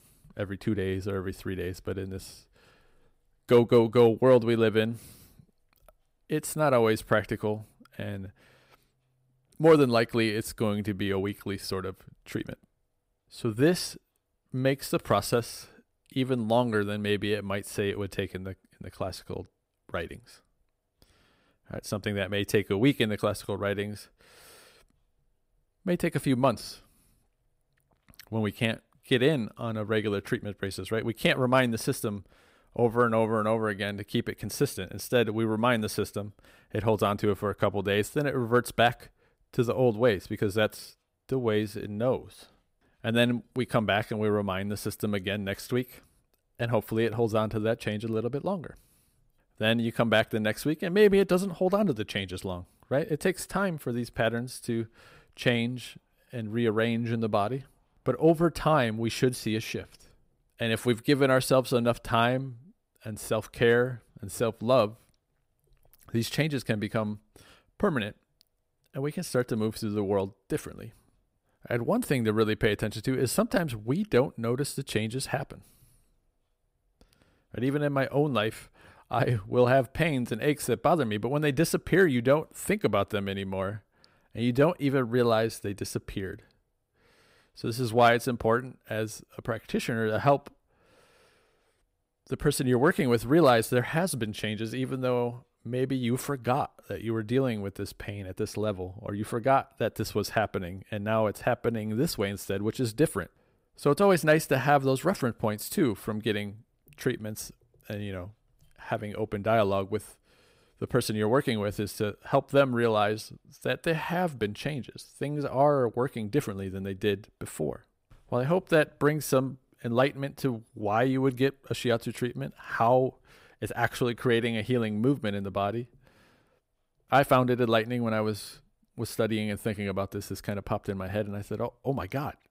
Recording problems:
none

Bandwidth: 15.5 kHz